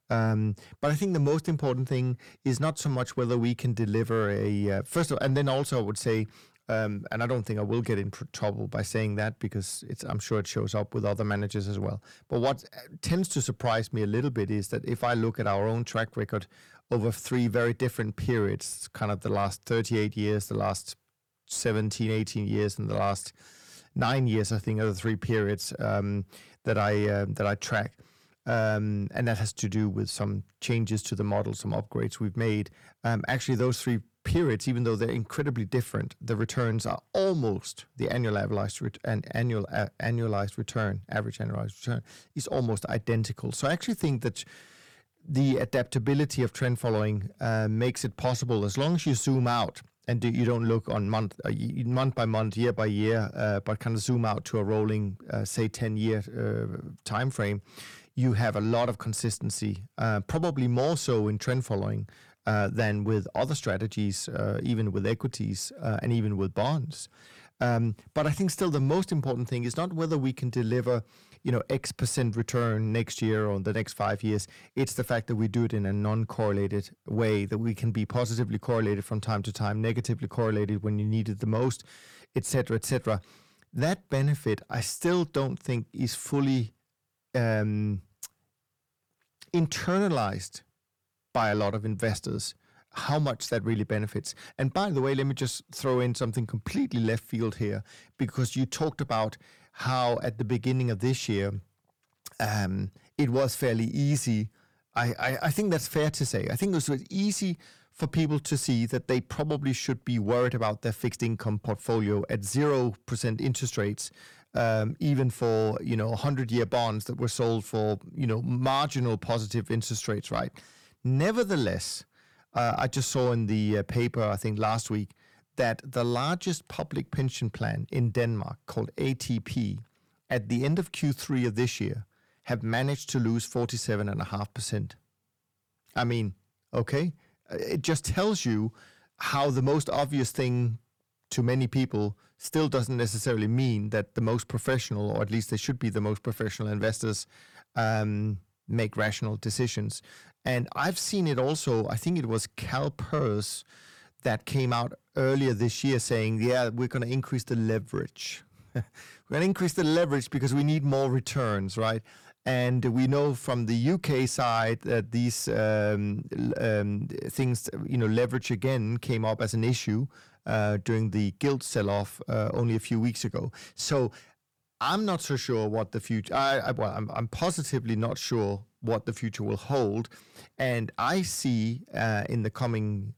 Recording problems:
distortion; slight; 10 dB below the speech

